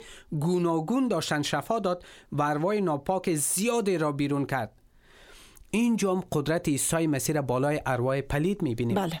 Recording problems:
squashed, flat; somewhat

